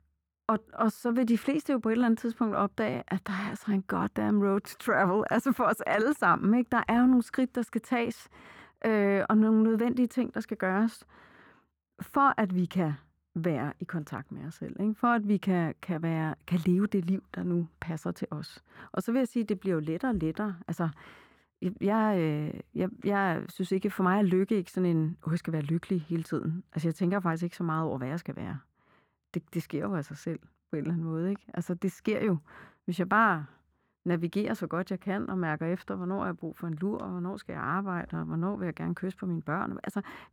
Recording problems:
muffled; very; fading above 3 kHz

